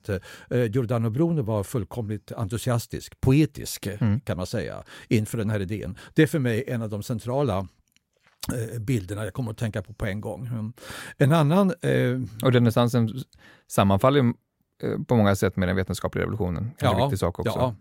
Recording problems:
none

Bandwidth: 16 kHz